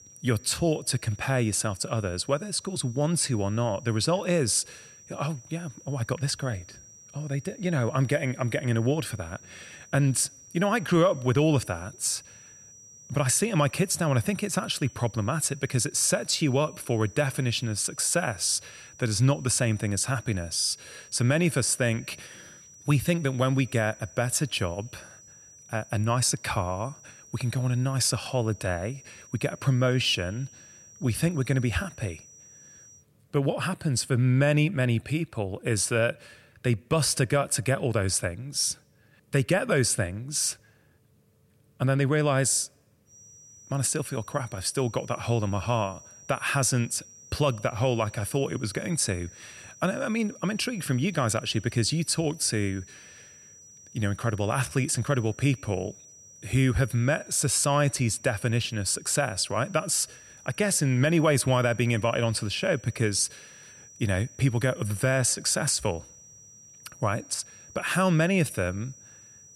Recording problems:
high-pitched whine; faint; until 33 s and from 43 s on; 6 kHz, 20 dB below the speech

